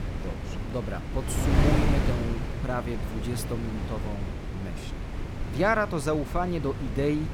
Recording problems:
wind noise on the microphone; heavy; 6 dB below the speech

